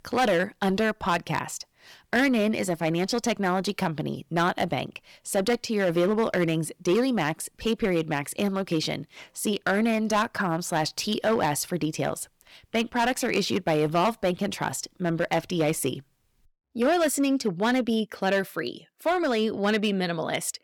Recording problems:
distortion; slight; 5% of the sound clipped

